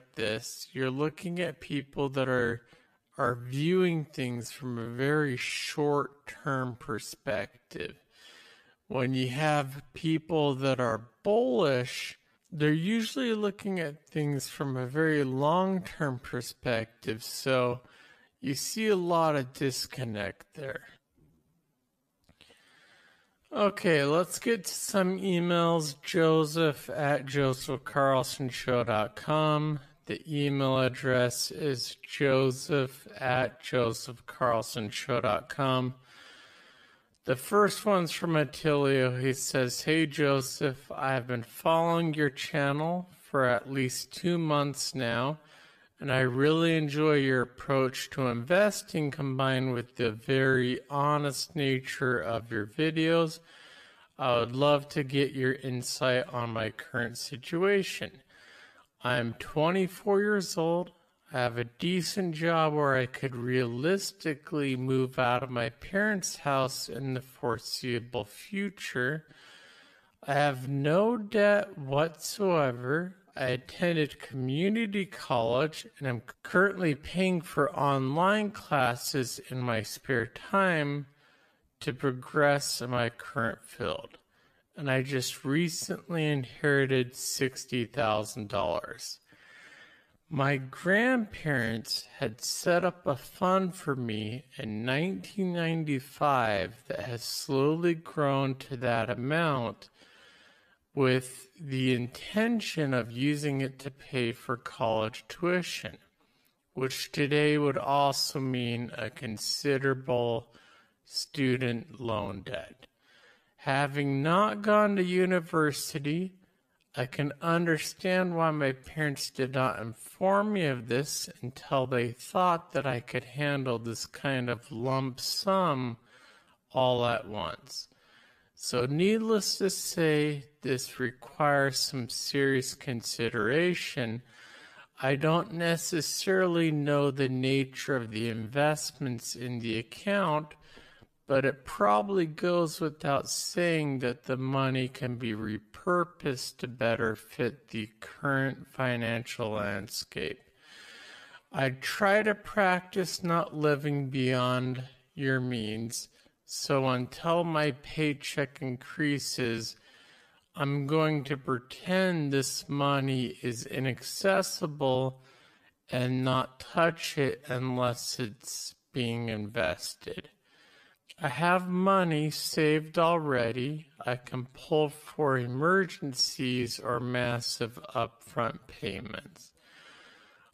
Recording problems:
wrong speed, natural pitch; too slow; 0.5 times normal speed

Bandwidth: 14.5 kHz